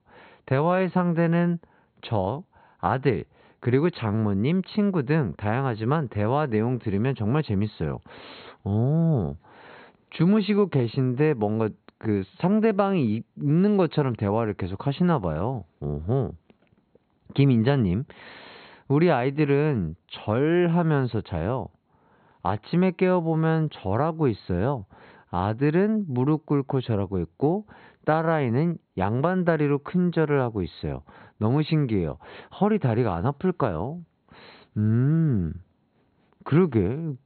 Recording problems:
high frequencies cut off; severe; nothing above 4.5 kHz

